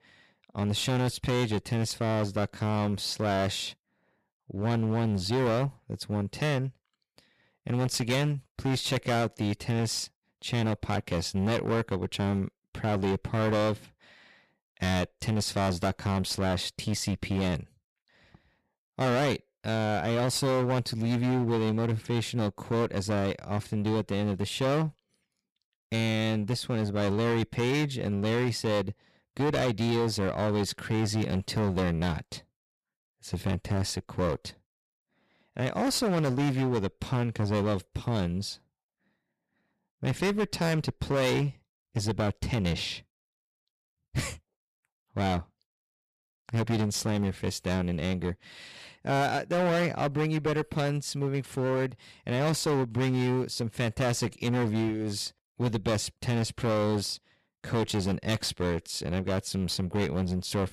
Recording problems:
distortion; heavy; 17% of the sound clipped

